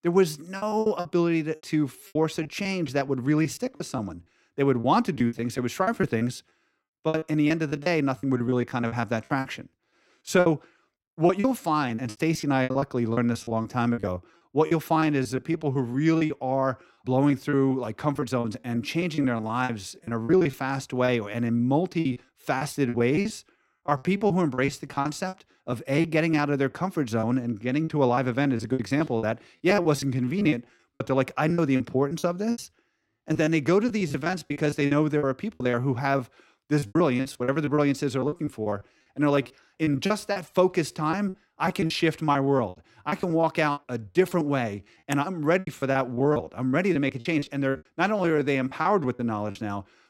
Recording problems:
choppy; very; 16% of the speech affected

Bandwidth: 16 kHz